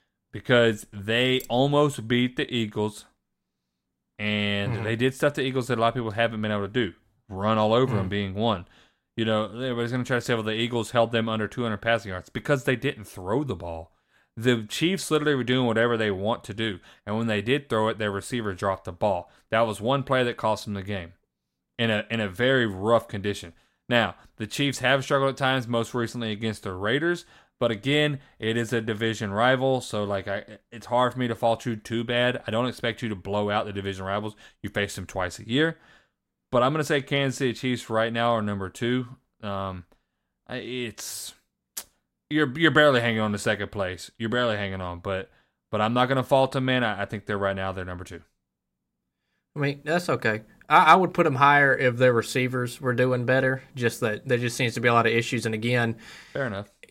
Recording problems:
none

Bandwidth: 16 kHz